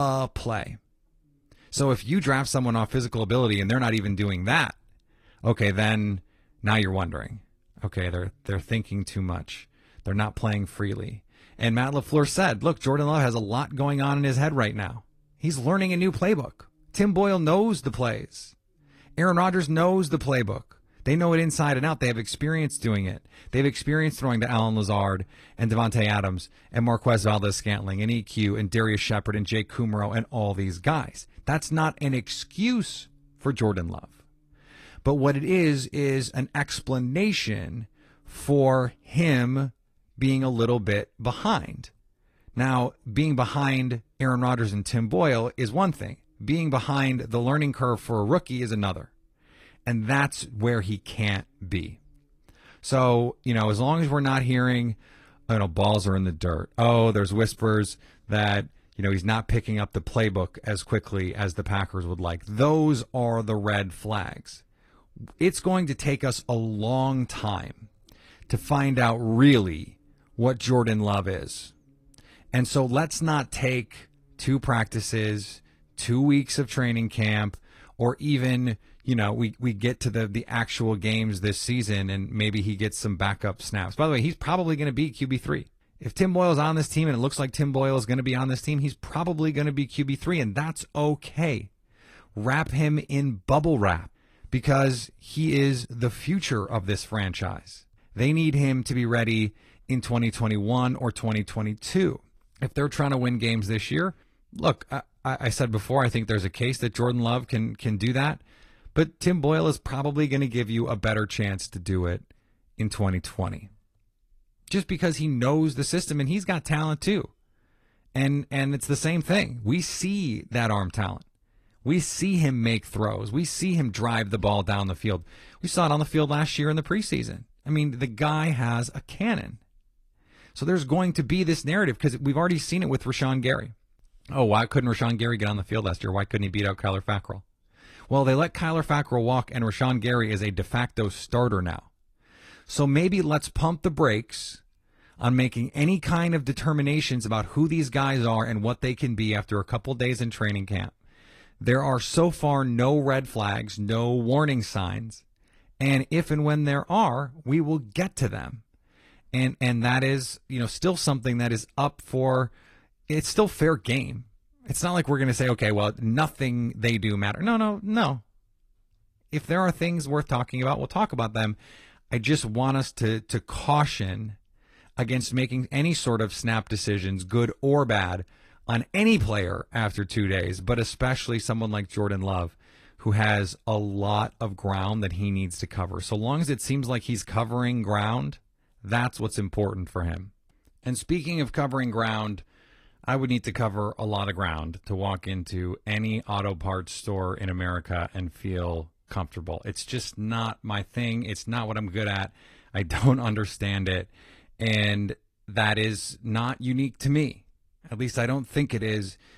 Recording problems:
garbled, watery; slightly; nothing above 13 kHz
abrupt cut into speech; at the start

